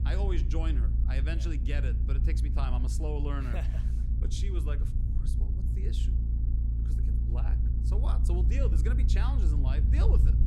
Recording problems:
low rumble; loud; throughout; 5 dB below the speech

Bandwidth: 16 kHz